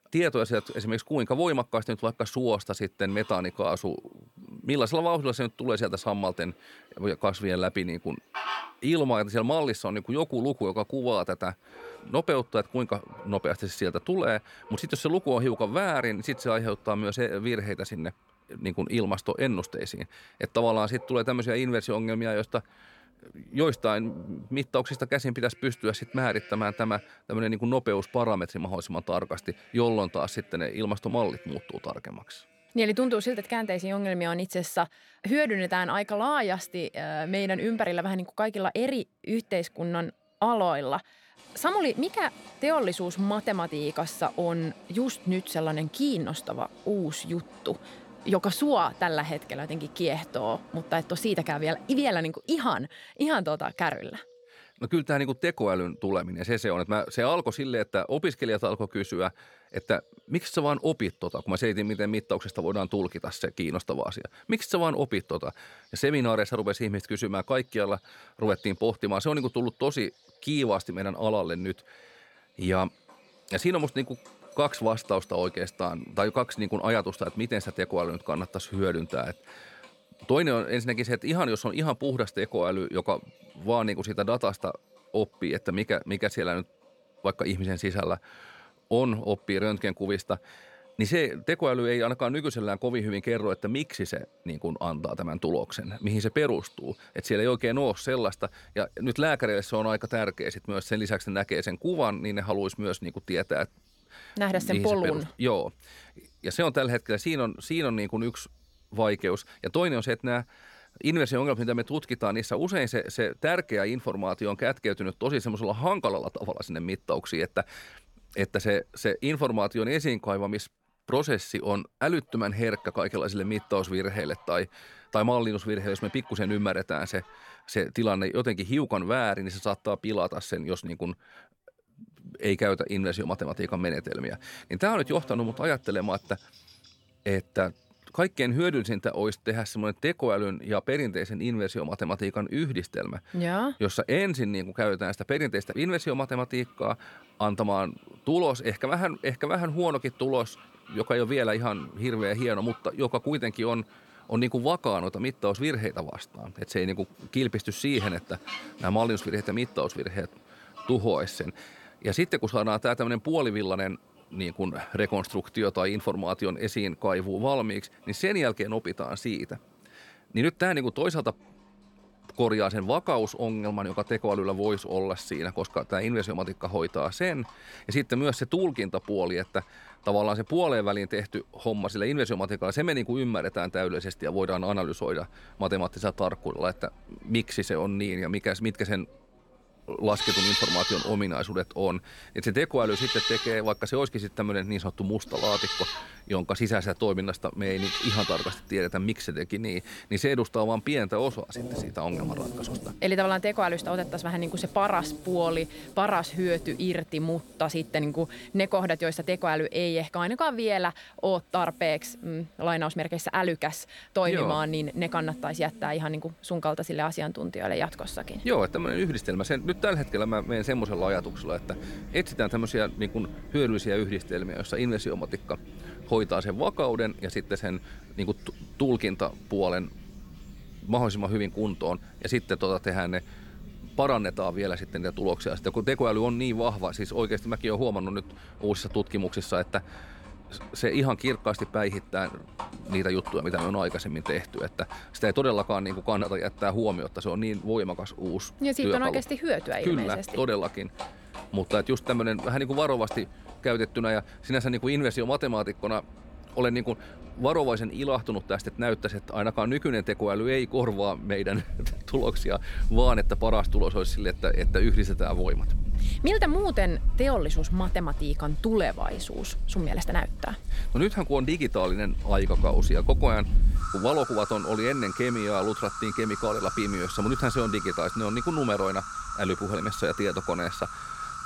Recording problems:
animal sounds; loud; throughout; 8 dB below the speech

